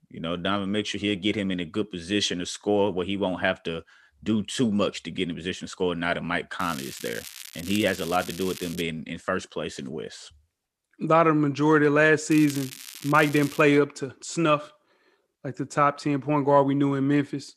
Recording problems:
crackling; noticeable; from 6.5 to 9 s and from 12 to 14 s; 15 dB below the speech

